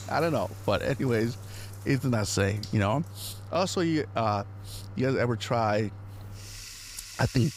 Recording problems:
household noises; noticeable; throughout; 15 dB below the speech

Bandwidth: 15.5 kHz